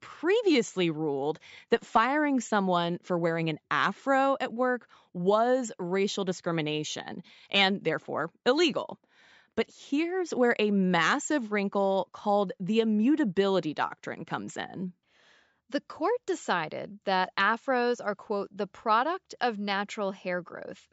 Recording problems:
high frequencies cut off; noticeable; nothing above 8 kHz

